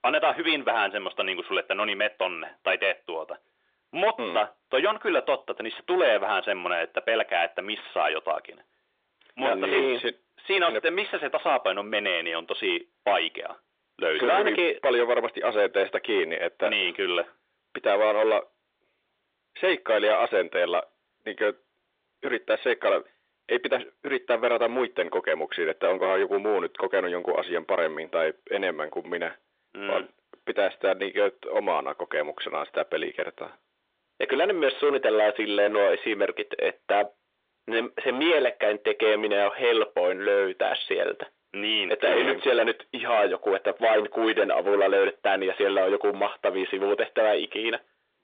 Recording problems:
distortion; heavy; 12% of the sound clipped
phone-call audio

